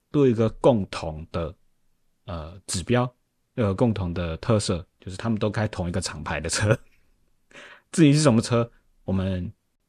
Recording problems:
none

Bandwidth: 14 kHz